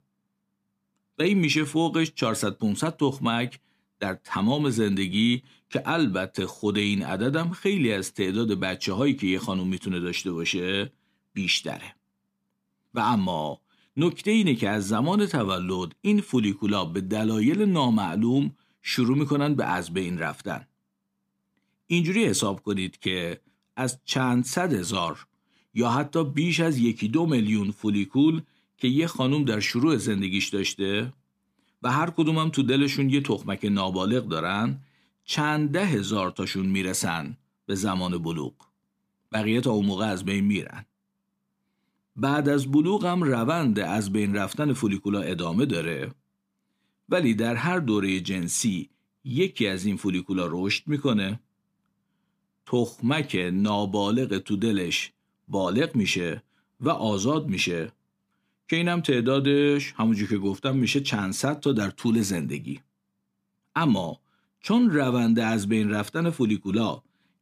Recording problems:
none

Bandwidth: 15 kHz